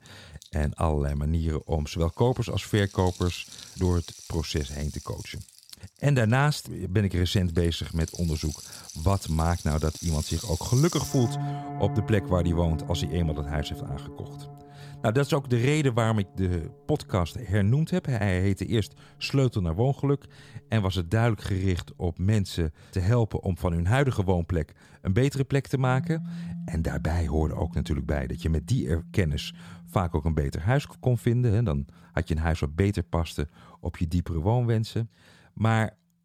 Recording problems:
background music; noticeable; throughout; 10 dB below the speech

